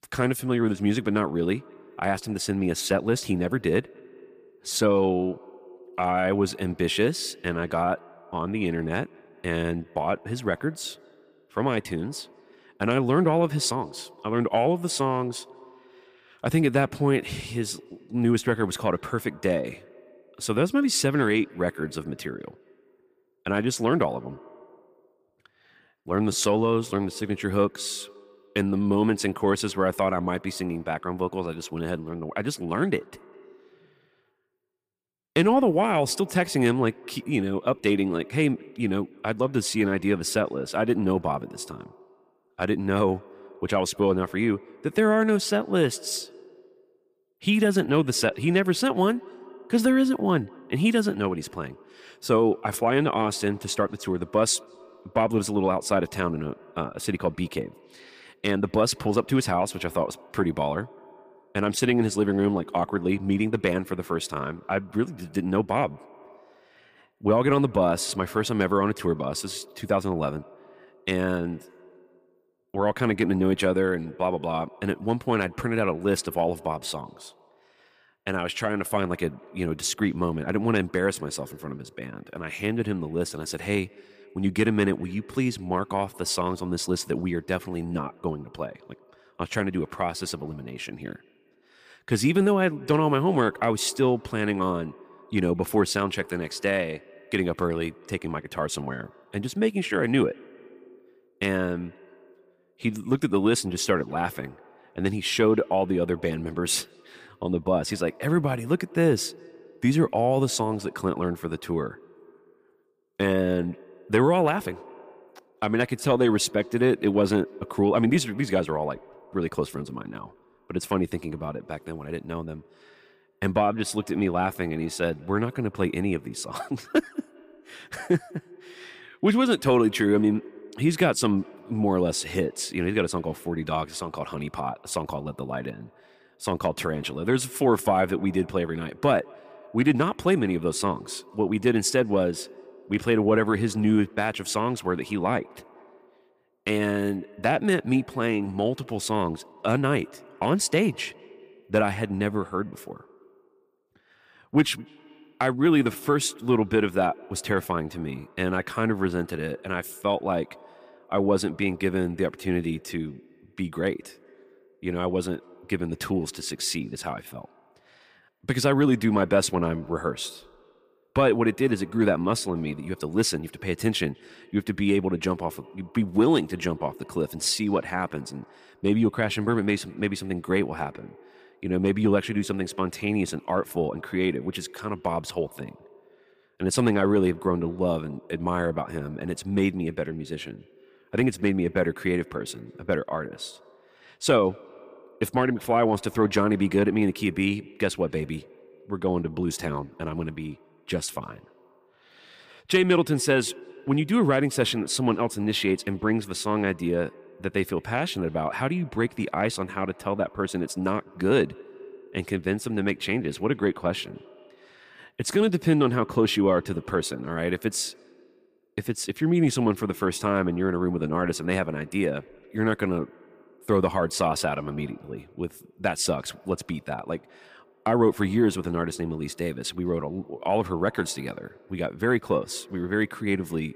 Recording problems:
echo of what is said; faint; throughout; 200 ms later, 25 dB below the speech

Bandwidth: 15 kHz